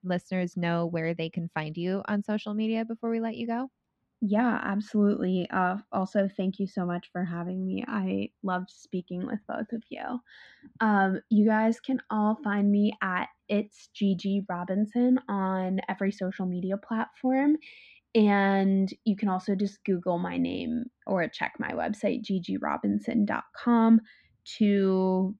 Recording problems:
muffled; slightly; fading above 3 kHz

